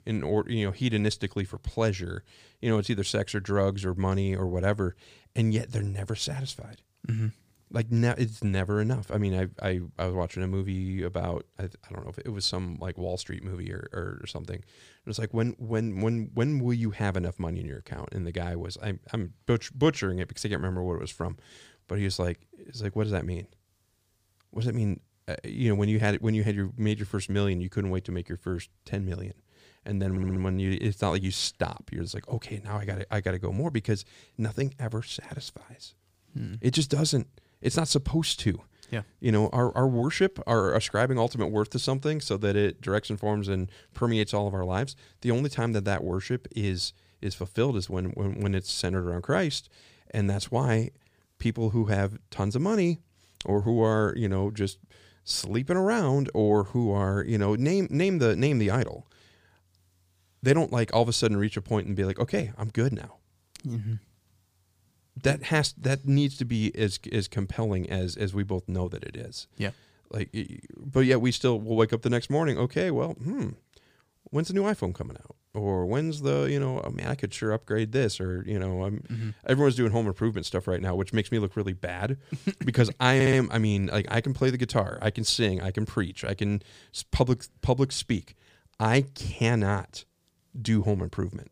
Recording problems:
audio stuttering; at 30 s and at 1:23

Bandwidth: 15 kHz